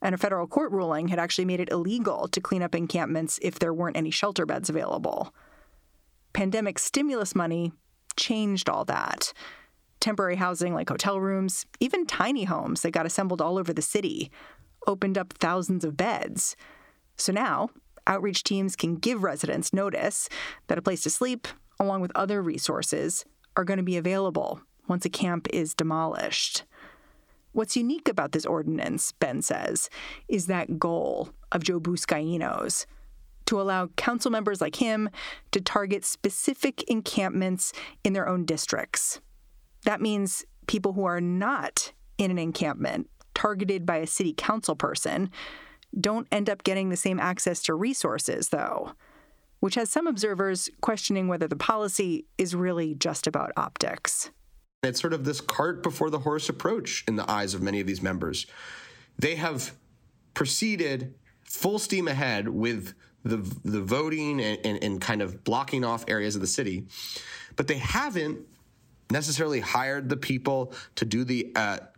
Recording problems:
squashed, flat; somewhat

